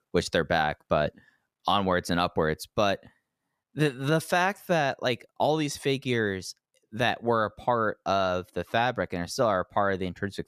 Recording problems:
none

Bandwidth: 14.5 kHz